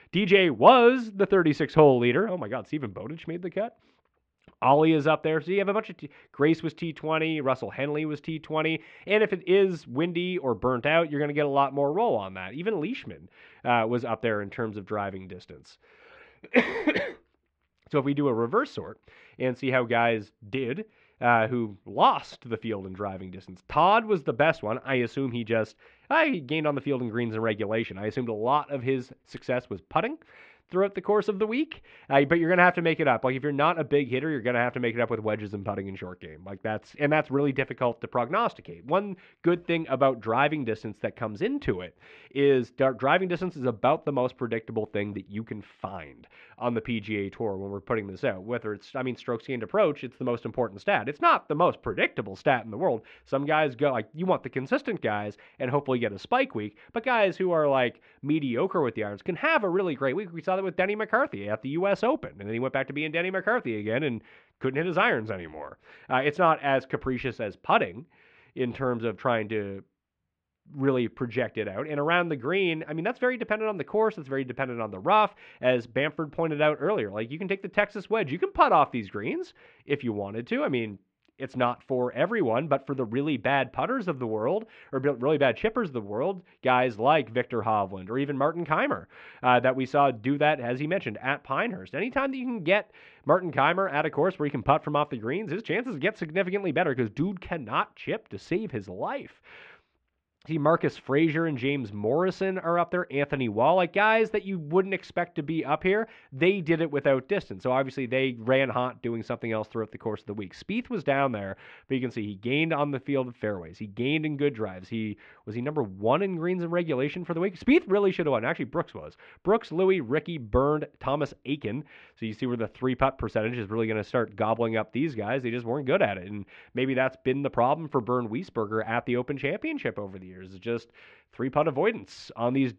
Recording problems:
muffled; very; fading above 2.5 kHz

